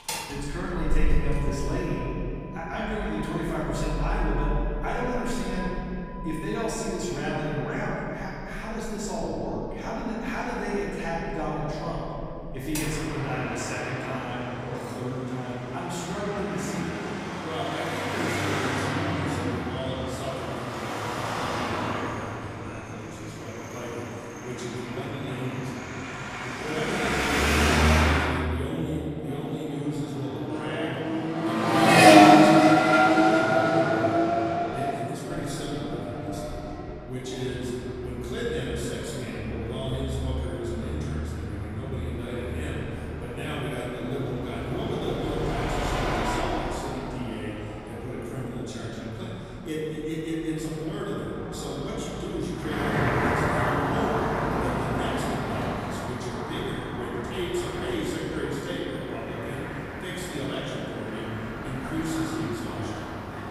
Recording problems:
room echo; strong; dies away in 2.8 s
off-mic speech; far
traffic noise; very loud; throughout; 6 dB above the speech

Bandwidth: 15.5 kHz